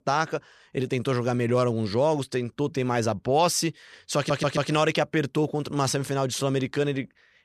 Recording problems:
audio stuttering; at 4 s

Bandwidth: 13.5 kHz